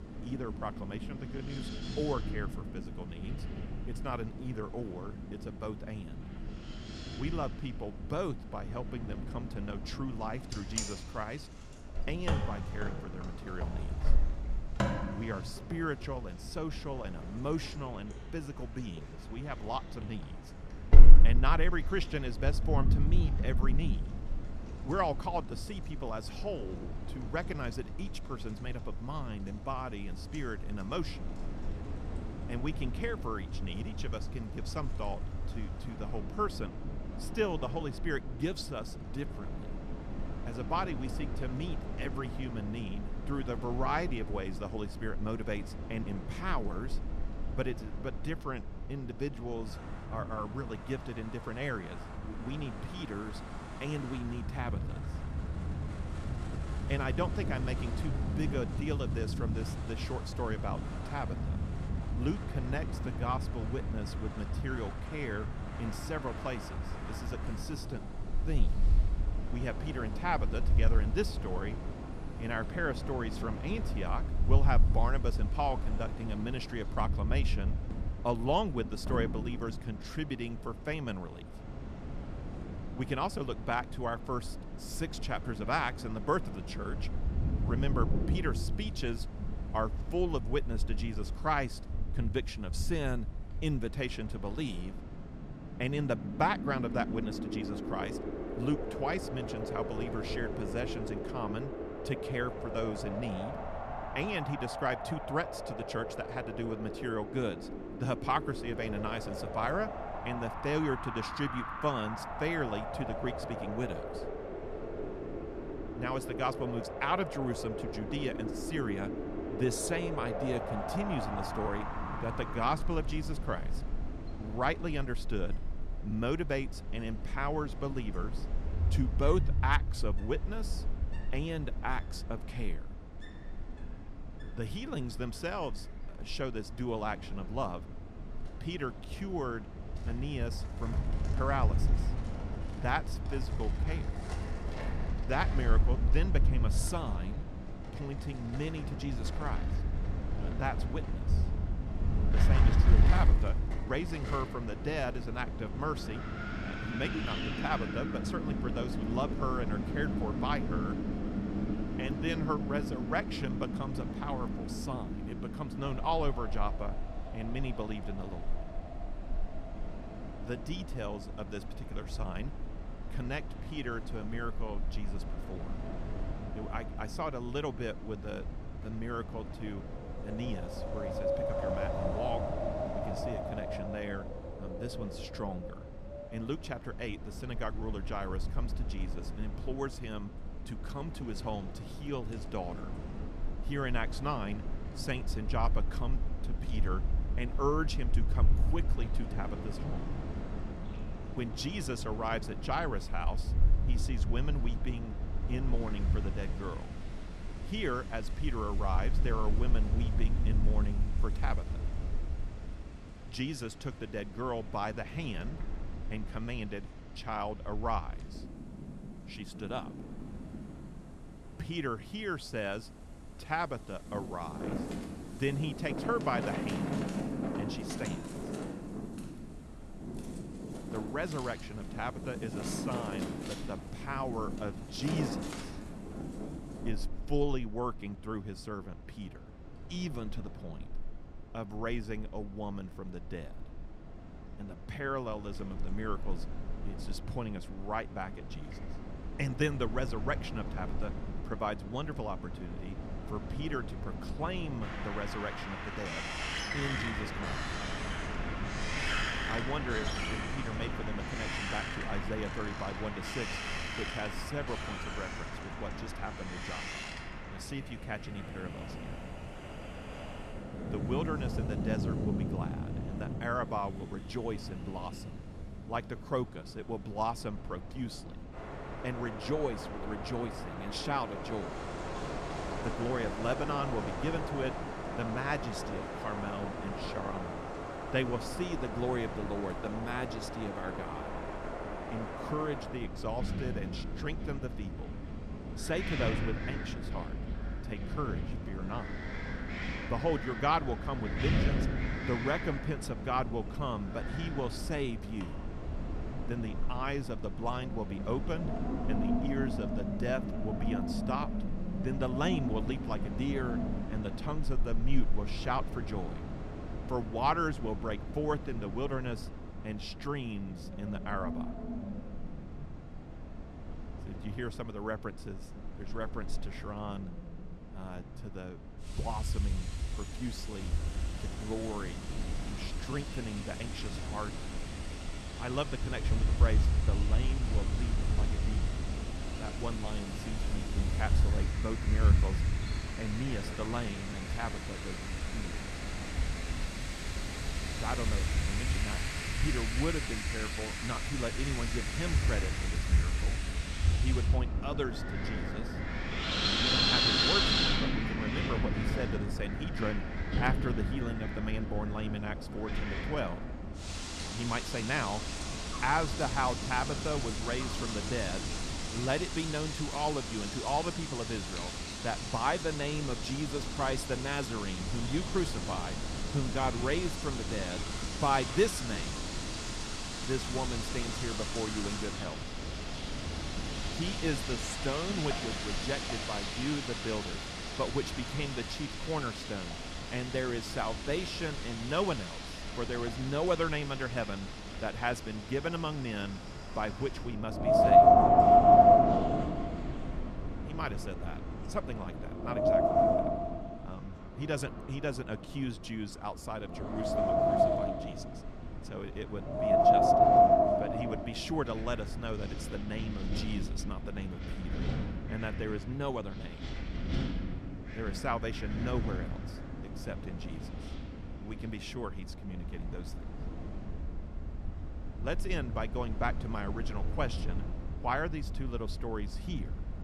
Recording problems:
wind in the background; very loud; throughout; 2 dB above the speech

